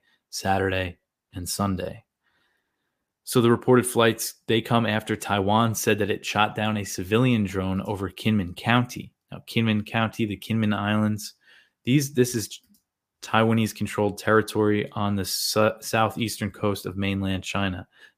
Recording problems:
none

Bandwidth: 15 kHz